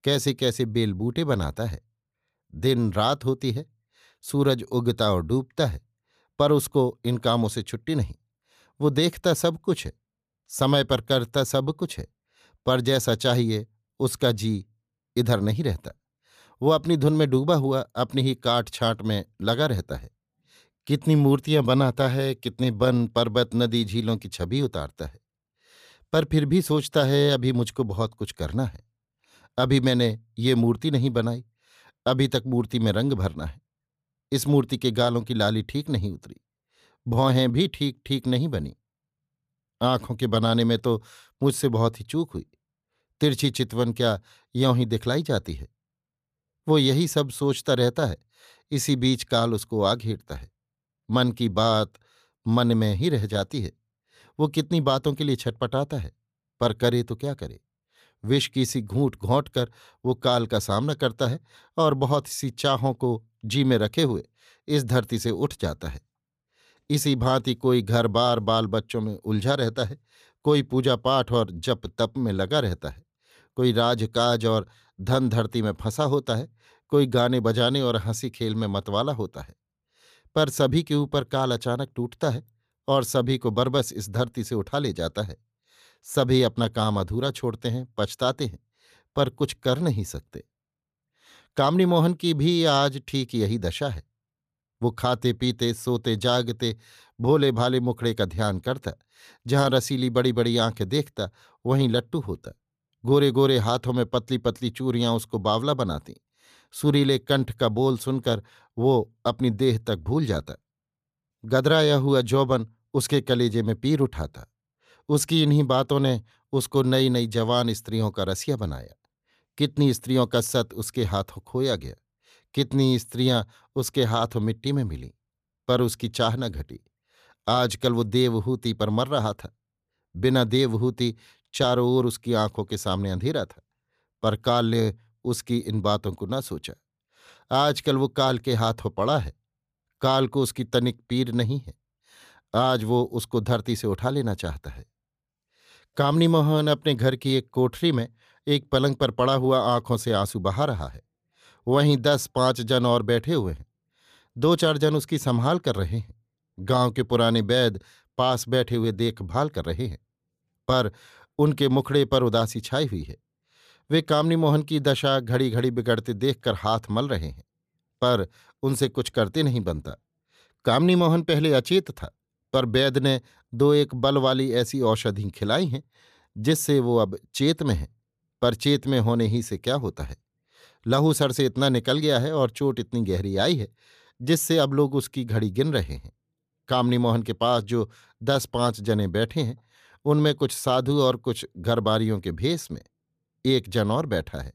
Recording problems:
none

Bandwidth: 14.5 kHz